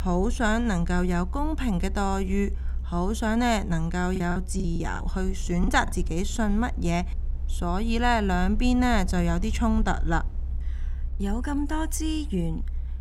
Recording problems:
low rumble; faint; throughout; 25 dB below the speech
choppy; very; from 4 to 5.5 s; 13% of the speech affected

